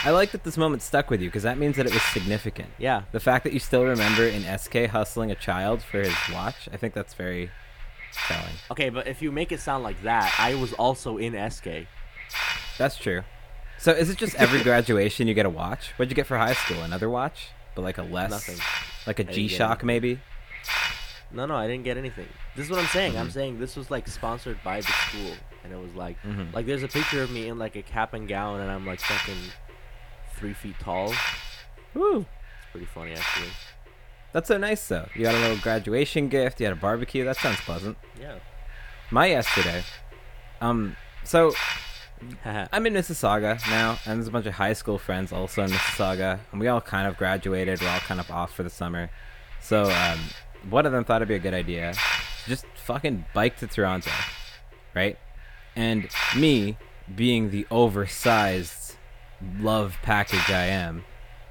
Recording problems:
hiss; loud; throughout; 3 dB below the speech

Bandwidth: 18 kHz